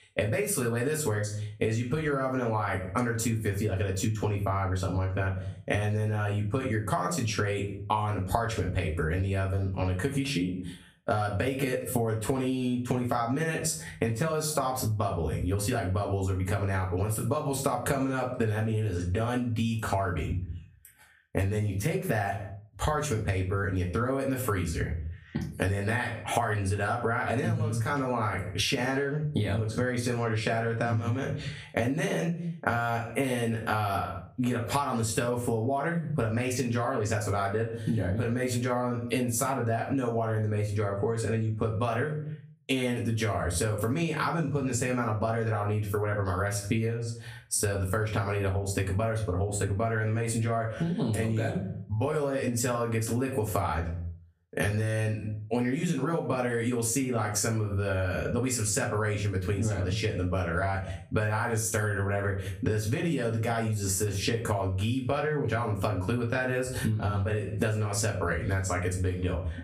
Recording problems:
off-mic speech; far
room echo; very slight; dies away in 0.3 s
squashed, flat; somewhat

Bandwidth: 15 kHz